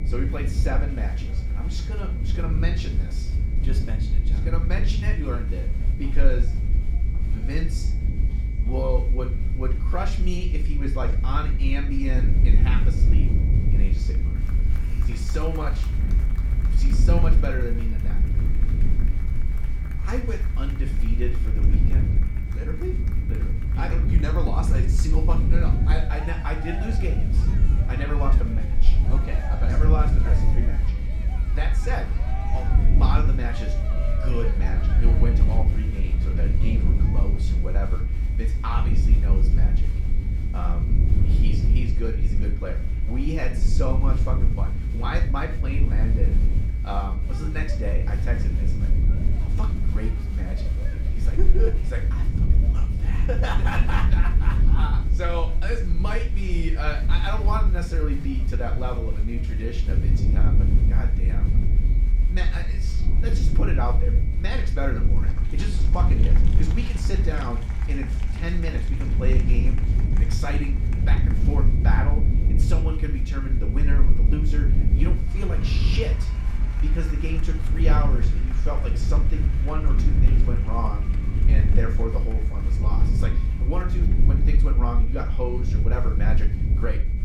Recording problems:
room echo; slight; dies away in 0.4 s
off-mic speech; somewhat distant
low rumble; loud; throughout; 6 dB below the speech
high-pitched whine; noticeable; throughout; 2.5 kHz, 20 dB below the speech
crowd noise; noticeable; throughout; 15 dB below the speech

